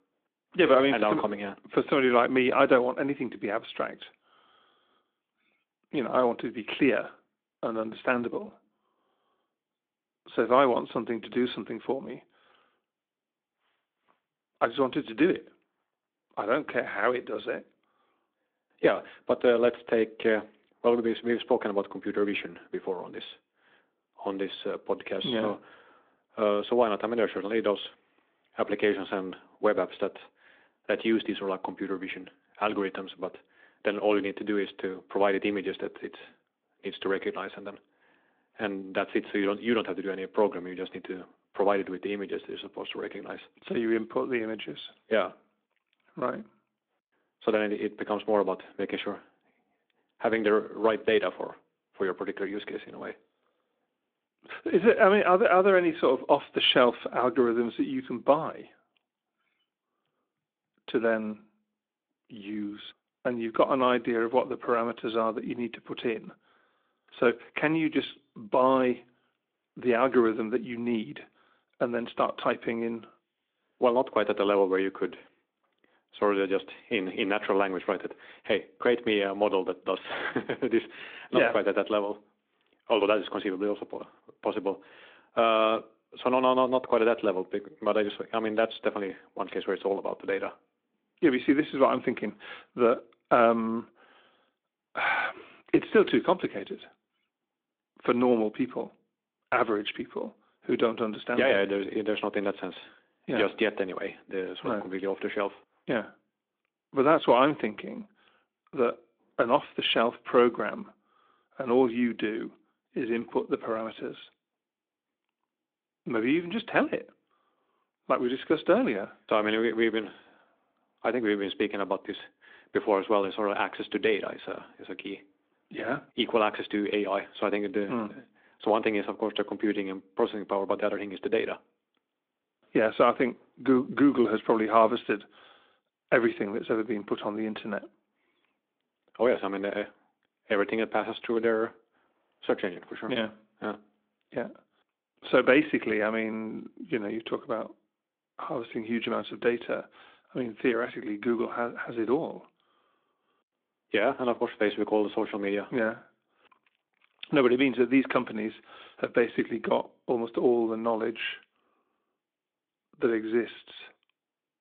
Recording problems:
phone-call audio

